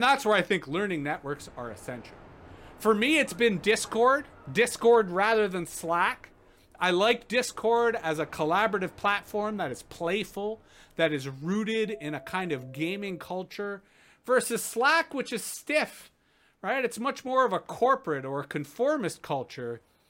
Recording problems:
train or aircraft noise; faint; throughout; 25 dB below the speech
abrupt cut into speech; at the start

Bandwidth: 16 kHz